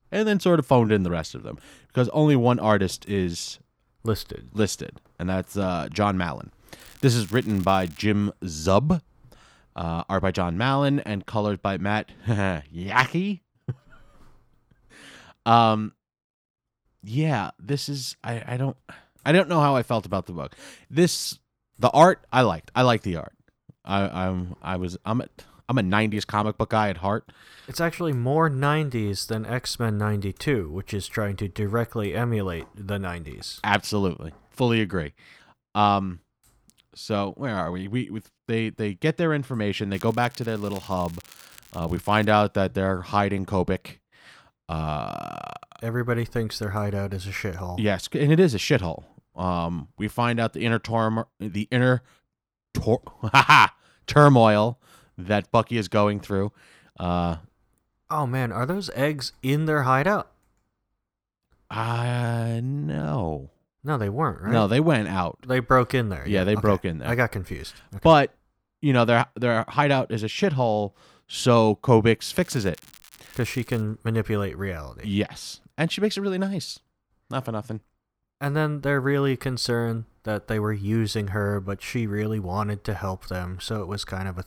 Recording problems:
crackling; faint; from 7 to 8 s, from 40 to 42 s and from 1:12 to 1:14; 25 dB below the speech

